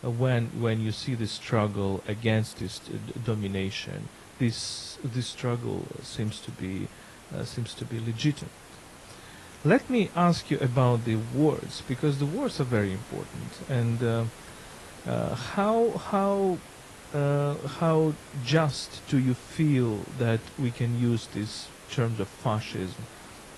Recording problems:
garbled, watery; slightly
hiss; noticeable; throughout; 20 dB below the speech

